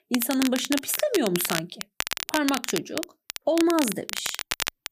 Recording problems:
crackle, like an old record; loud; 5 dB below the speech

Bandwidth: 15 kHz